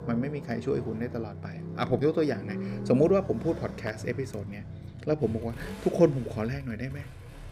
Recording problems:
traffic noise; noticeable; throughout; 10 dB below the speech

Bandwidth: 15.5 kHz